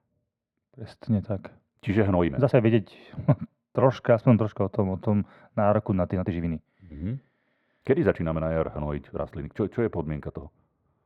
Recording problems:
muffled; very; fading above 2.5 kHz
thin; somewhat; fading below 600 Hz
uneven, jittery; strongly; from 2 to 11 s

